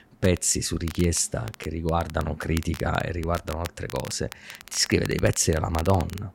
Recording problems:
crackle, like an old record; noticeable; 15 dB below the speech

